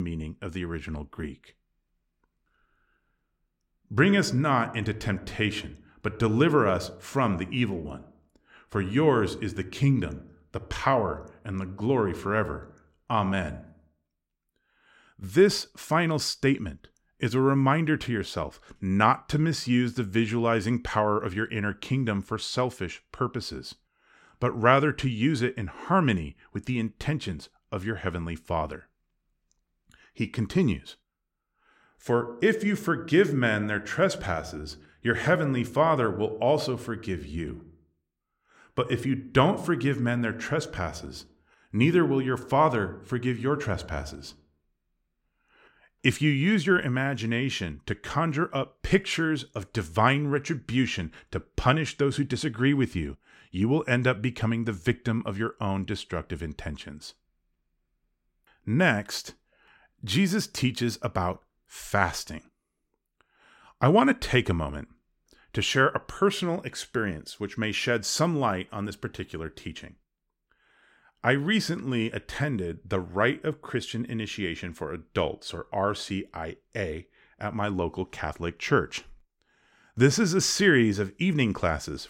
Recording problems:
abrupt cut into speech; at the start

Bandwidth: 16 kHz